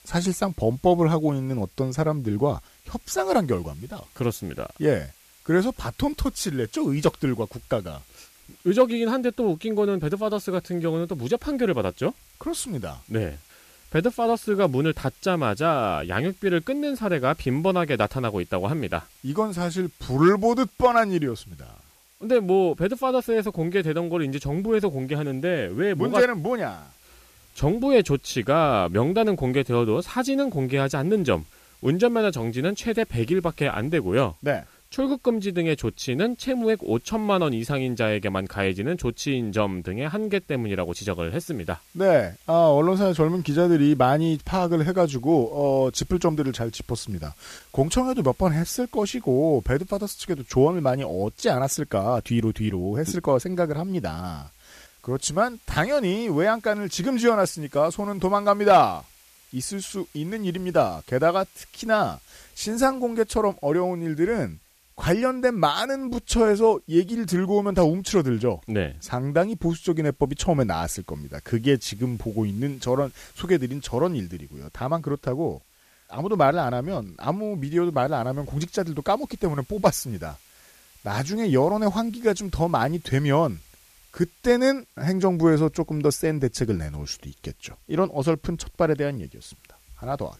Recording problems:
hiss; faint; throughout; 30 dB below the speech

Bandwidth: 14.5 kHz